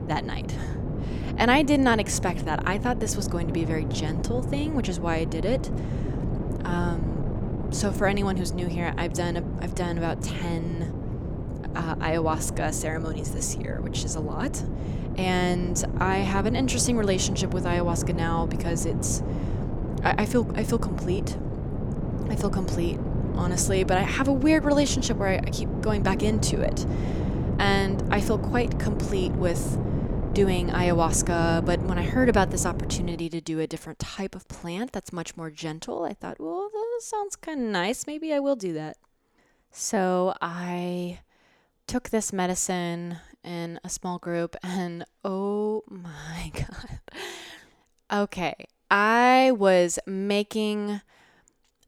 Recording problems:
wind noise on the microphone; heavy; until 33 s; 9 dB below the speech

